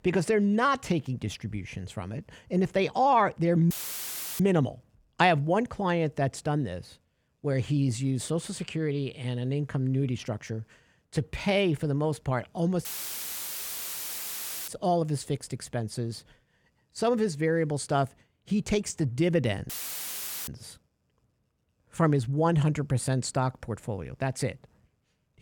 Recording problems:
audio cutting out; filled with static; at 3.5 s for 0.5 s, at 13 s for 2 s and at 20 s for 1 s

